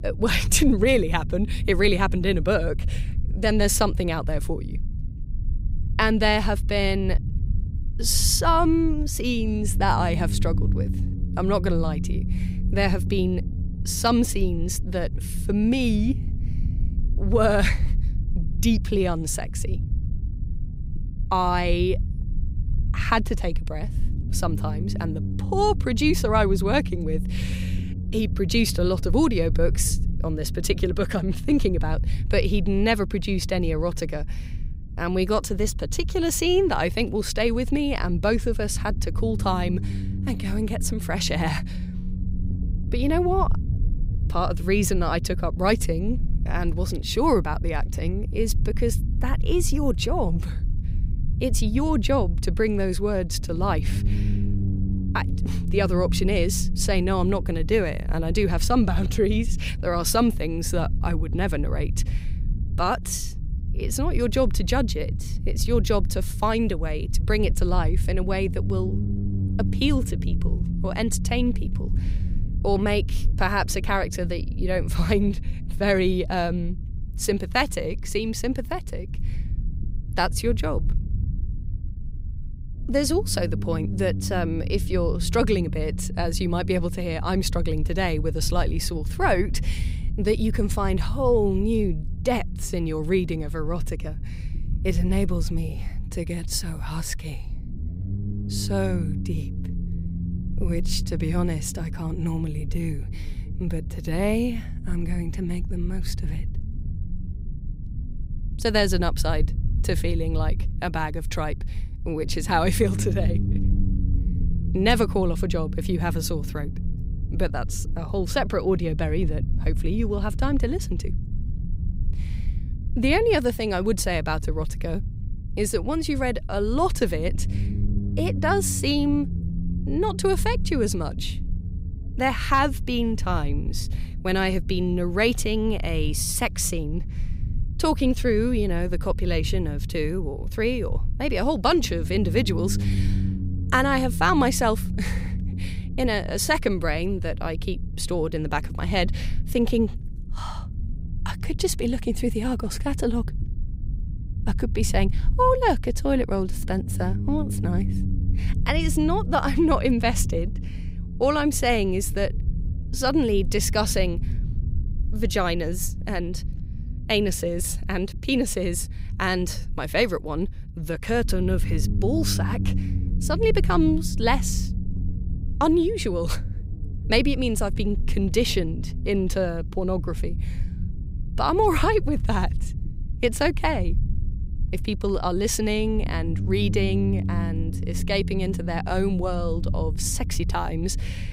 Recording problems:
low rumble; noticeable; throughout; 15 dB below the speech

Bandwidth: 15.5 kHz